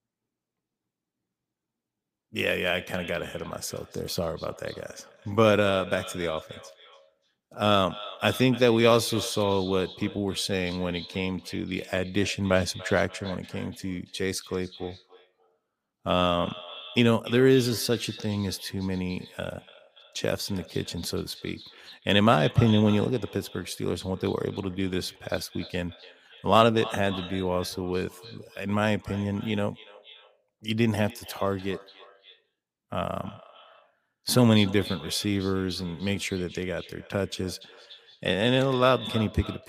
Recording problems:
echo of what is said; noticeable; throughout; 290 ms later, 15 dB below the speech

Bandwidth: 15 kHz